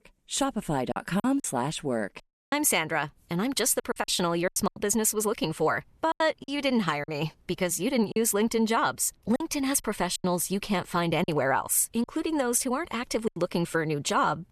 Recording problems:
choppy; very; 7% of the speech affected

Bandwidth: 13.5 kHz